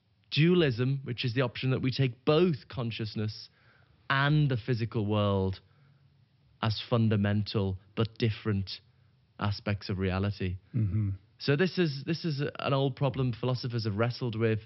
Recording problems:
high frequencies cut off; noticeable; nothing above 5.5 kHz

